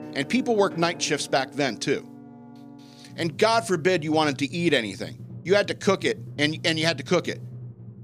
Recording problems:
background music; noticeable; throughout; 15 dB below the speech

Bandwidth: 15 kHz